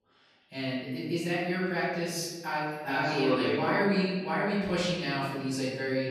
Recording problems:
room echo; strong; dies away in 1.3 s
off-mic speech; far
echo of what is said; faint; throughout; 130 ms later, 20 dB below the speech

